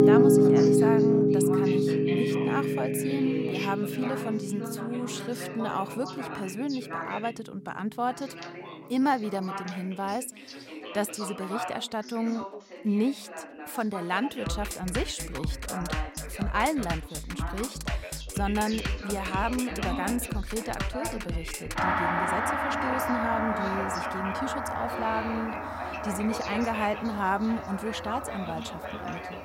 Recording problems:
background music; very loud; throughout; 3 dB above the speech
background chatter; loud; throughout; 2 voices, 7 dB below the speech

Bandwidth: 16 kHz